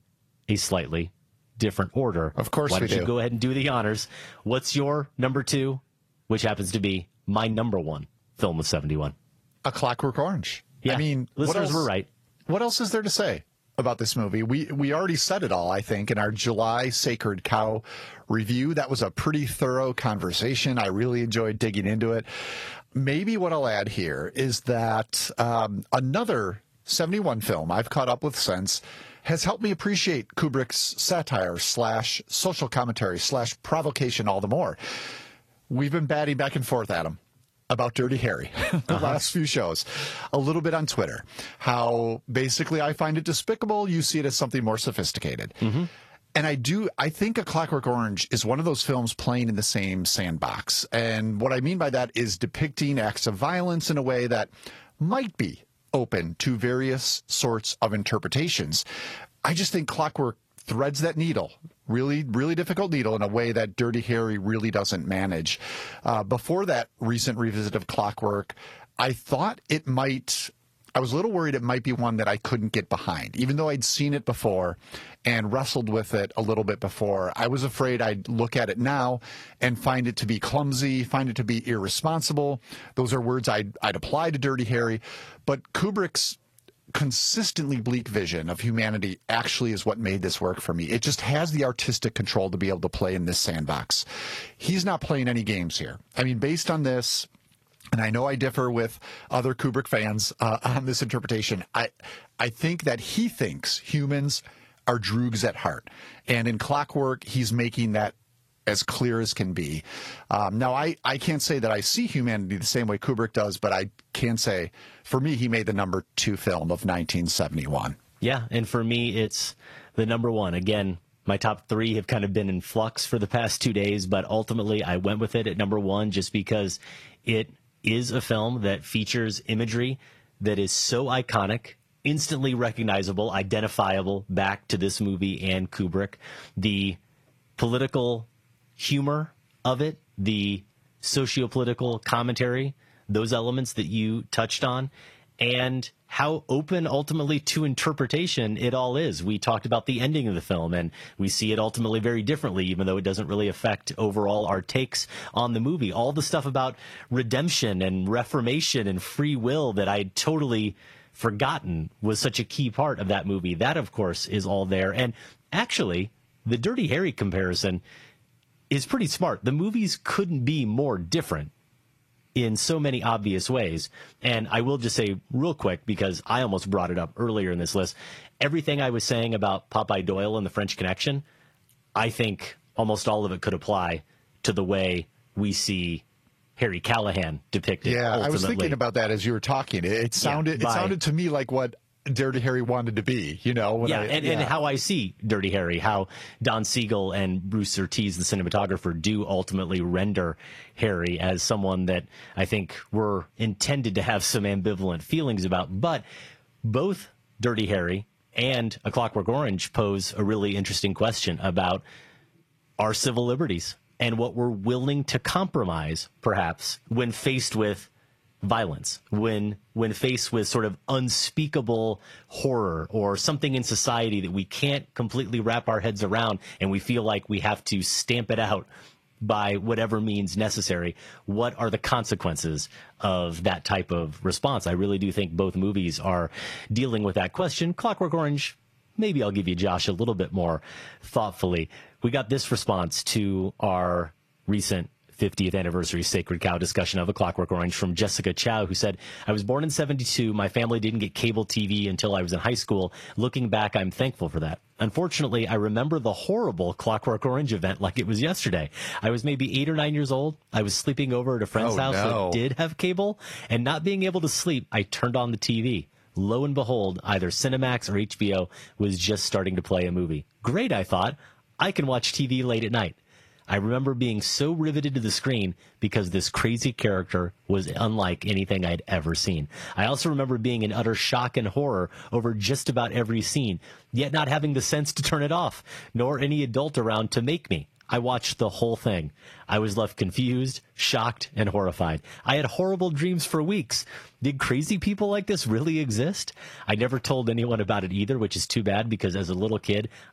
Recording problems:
garbled, watery; slightly; nothing above 13.5 kHz
squashed, flat; somewhat

